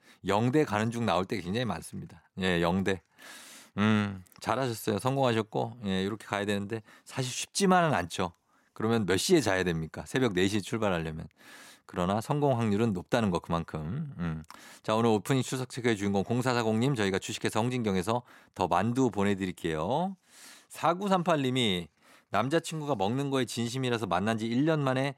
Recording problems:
none

